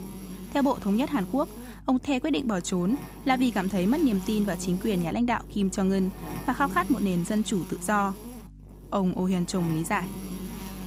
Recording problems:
electrical hum; noticeable; throughout; 50 Hz, 15 dB below the speech

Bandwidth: 15.5 kHz